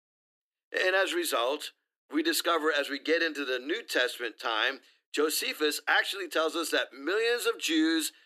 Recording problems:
thin; somewhat; fading below 300 Hz

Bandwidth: 14 kHz